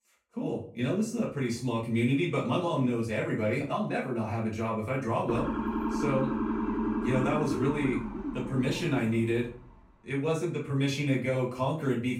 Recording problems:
off-mic speech; far
room echo; slight; dies away in 0.4 s
siren; noticeable; from 5.5 to 9.5 s; peak level with the speech

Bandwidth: 16 kHz